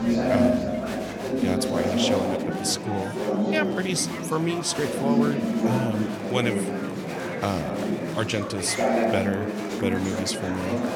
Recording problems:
murmuring crowd; very loud; throughout; 2 dB above the speech

